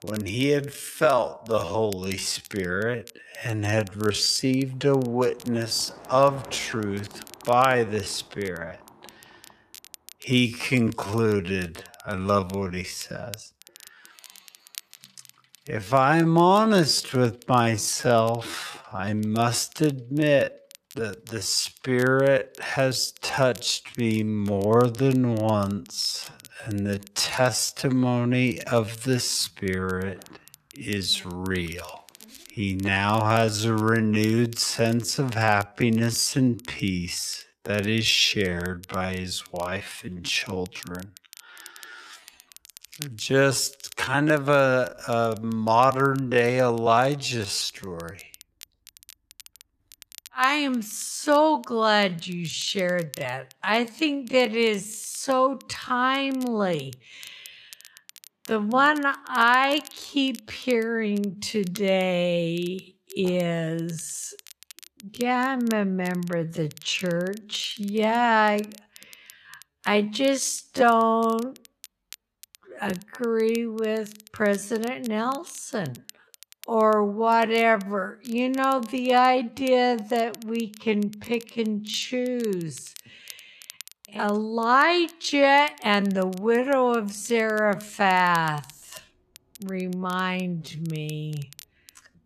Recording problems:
wrong speed, natural pitch; too slow; 0.5 times normal speed
traffic noise; faint; throughout; 30 dB below the speech
crackle, like an old record; faint; 25 dB below the speech

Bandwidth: 14 kHz